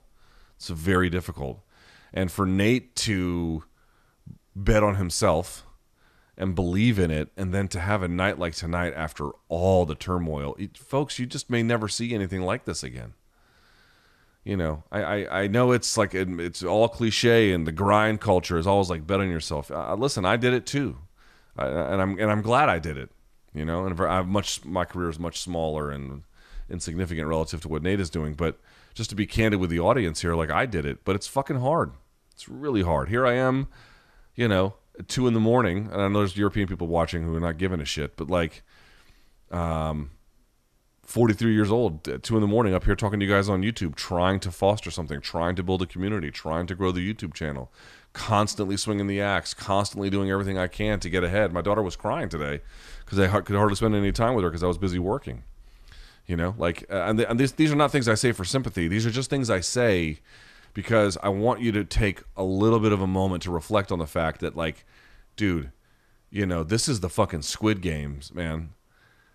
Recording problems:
none

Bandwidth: 14 kHz